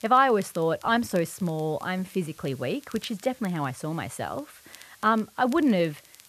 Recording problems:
muffled; slightly; fading above 3.5 kHz
hiss; faint; throughout; 25 dB below the speech
crackle, like an old record; faint; 25 dB below the speech

